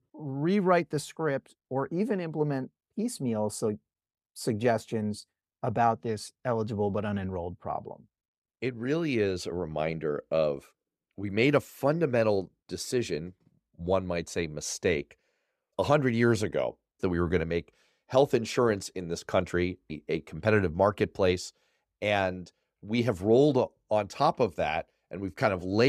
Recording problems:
abrupt cut into speech; at the end

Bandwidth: 14.5 kHz